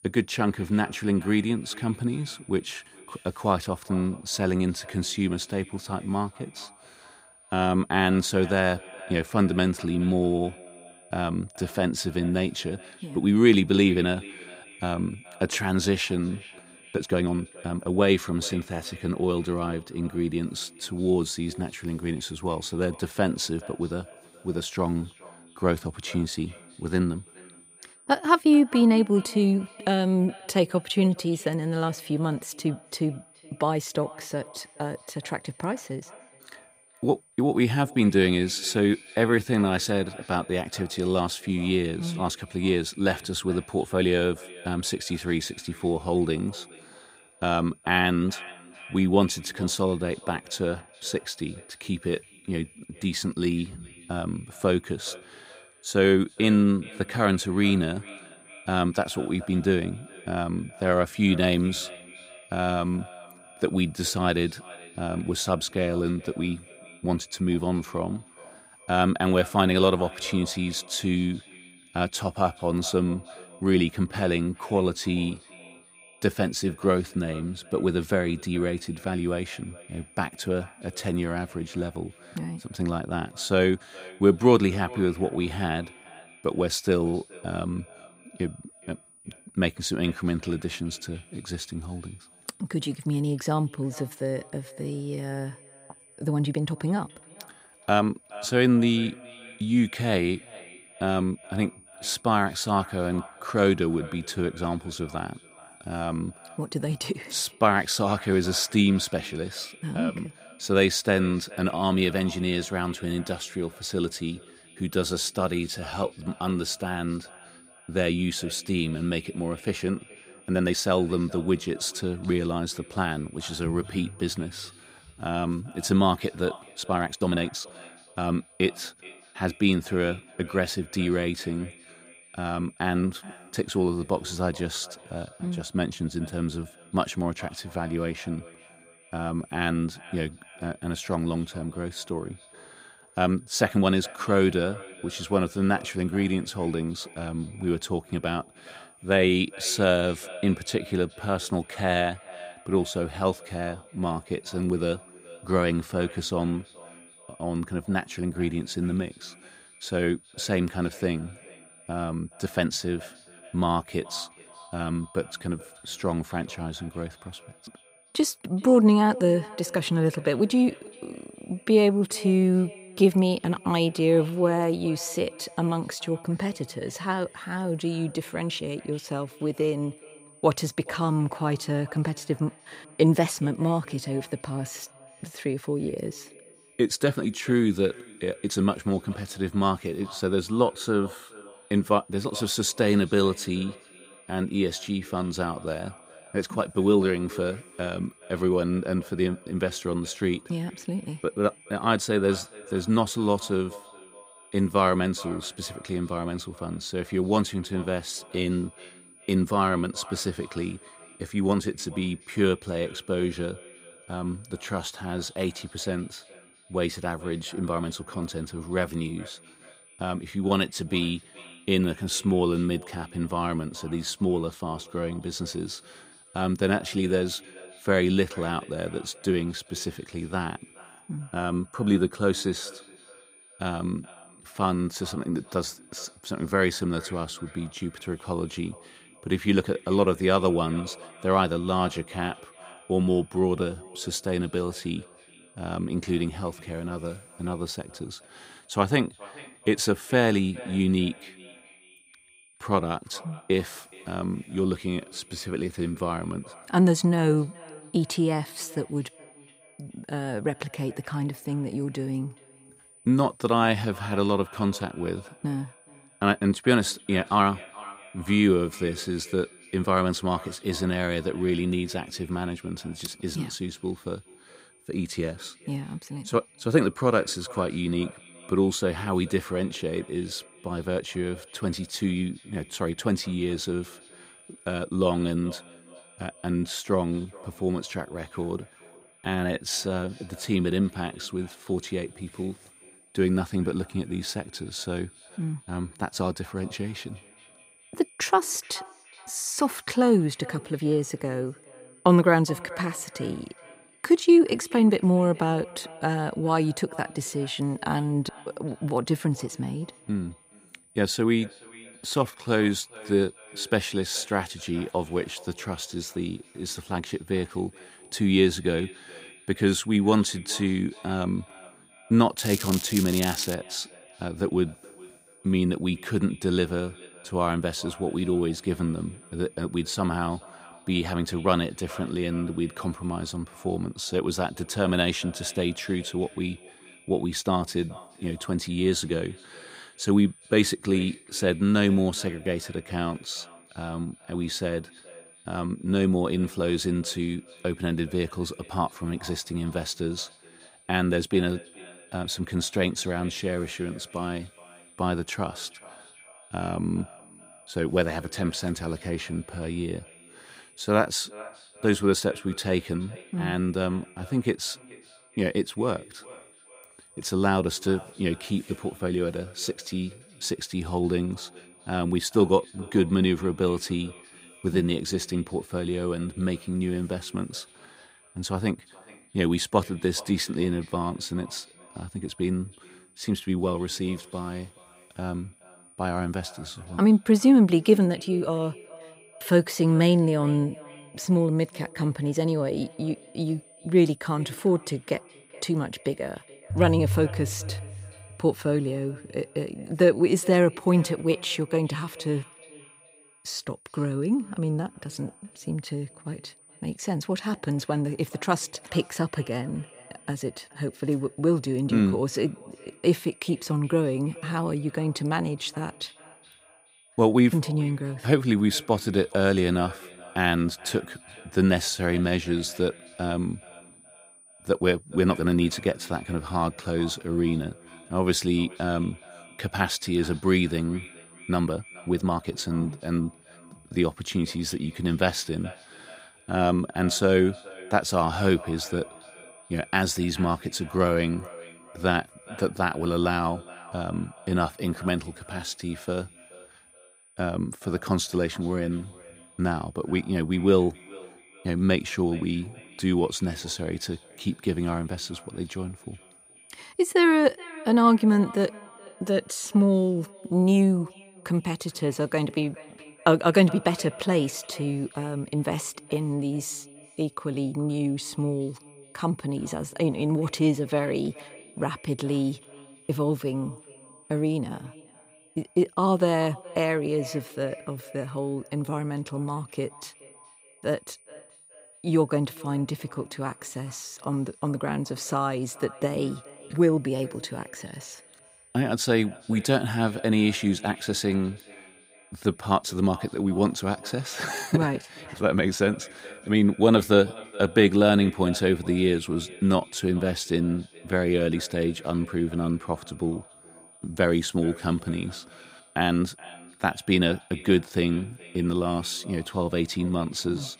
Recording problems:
echo of what is said; faint; throughout; 420 ms later, 20 dB below the speech
crackling; loud; from 5:22 to 5:24; 6 dB below the speech
high-pitched whine; faint; throughout; 9.5 kHz, 25 dB below the speech
uneven, jittery; strongly; from 17 s to 8:20

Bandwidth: 15.5 kHz